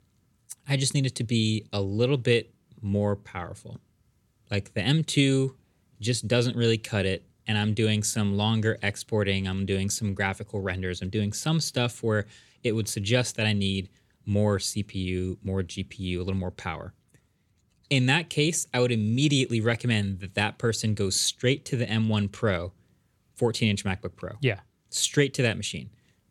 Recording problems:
none

